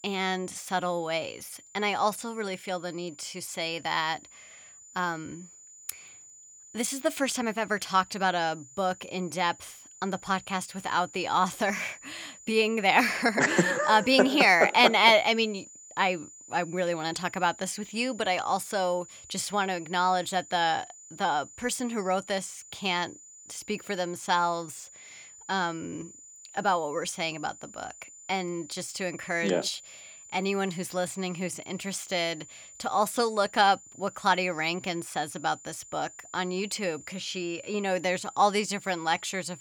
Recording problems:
high-pitched whine; noticeable; throughout; 7 kHz, 20 dB below the speech

